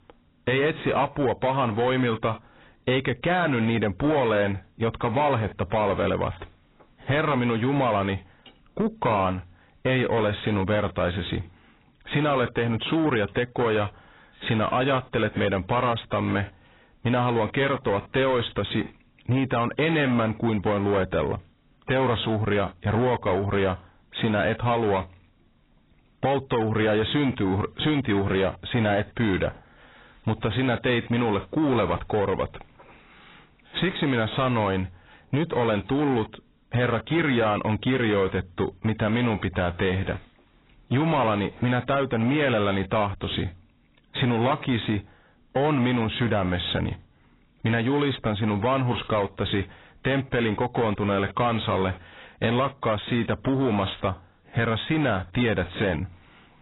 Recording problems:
garbled, watery; badly; nothing above 4 kHz
distortion; slight; 10 dB below the speech

